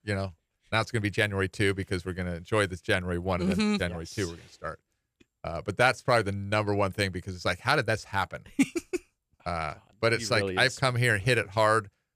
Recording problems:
none

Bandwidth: 14.5 kHz